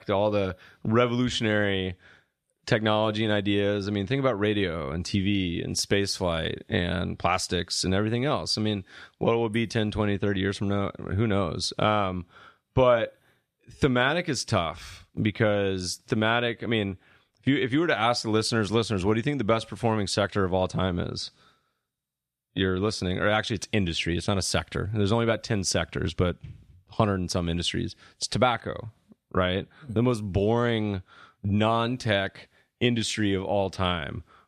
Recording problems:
none

